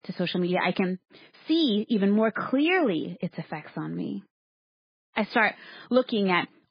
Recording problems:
garbled, watery; badly; nothing above 5 kHz

